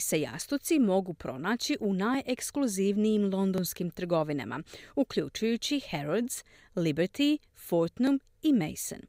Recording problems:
abrupt cut into speech; at the start

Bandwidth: 15.5 kHz